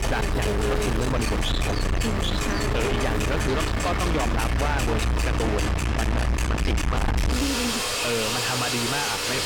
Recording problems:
distortion; heavy; 6 dB below the speech
household noises; very loud; throughout; 2 dB above the speech
electrical hum; loud; until 6.5 s; 60 Hz, 4 dB below the speech

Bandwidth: 18.5 kHz